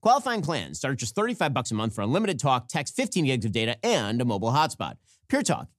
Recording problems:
none

